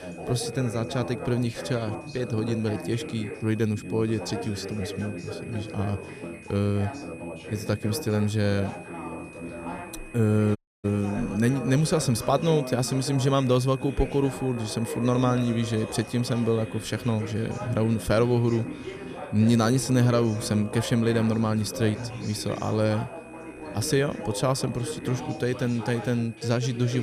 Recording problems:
background music; noticeable; from 9 s on; 20 dB below the speech
background chatter; noticeable; throughout; 3 voices, 10 dB below the speech
high-pitched whine; faint; throughout; 2.5 kHz, 20 dB below the speech
audio cutting out; at 11 s
abrupt cut into speech; at the end

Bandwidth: 14.5 kHz